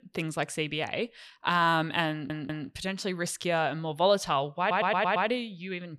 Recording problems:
audio stuttering; at 2 s and at 4.5 s

